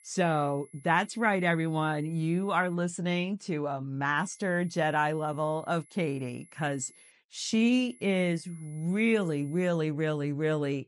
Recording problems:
high-pitched whine; faint; until 2.5 s, from 4 to 7 s and from 8 to 9.5 s; 11 kHz, 25 dB below the speech

